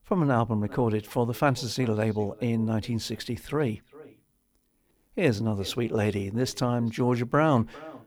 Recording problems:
echo of what is said; faint; throughout; 400 ms later, 25 dB below the speech

